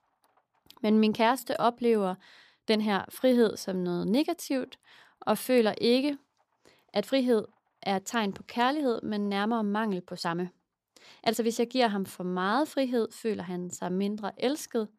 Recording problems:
uneven, jittery; strongly; from 0.5 to 14 s

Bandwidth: 14.5 kHz